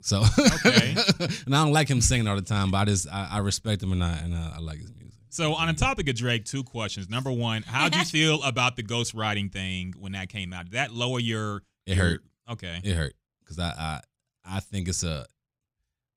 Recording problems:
none

